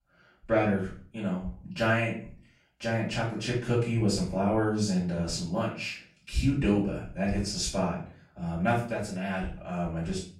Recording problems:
off-mic speech; far
room echo; noticeable; dies away in 0.4 s

